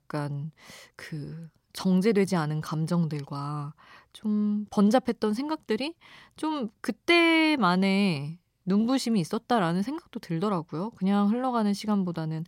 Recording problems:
none

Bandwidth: 16 kHz